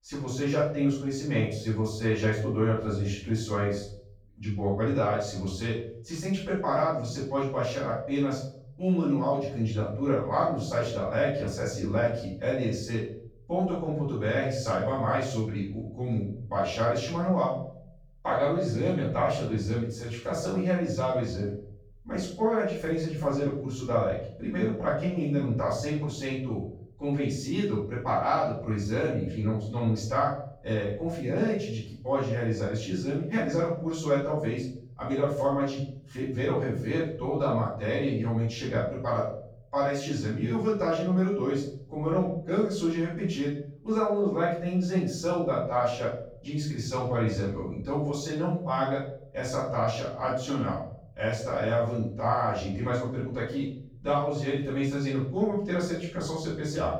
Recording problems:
off-mic speech; far
room echo; noticeable; dies away in 0.7 s

